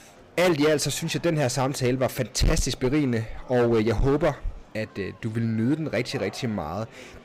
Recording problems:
distortion; heavy; 8% of the sound clipped
murmuring crowd; faint; throughout; 25 dB below the speech

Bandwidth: 15.5 kHz